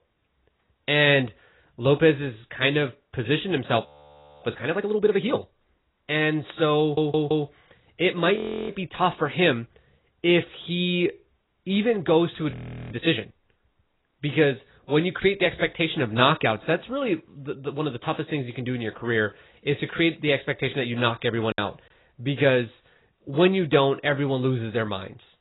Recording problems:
garbled, watery; badly; nothing above 4 kHz
audio freezing; at 4 s for 0.5 s, at 8.5 s and at 13 s
audio stuttering; at 7 s
choppy; very; at 22 s; 6% of the speech affected

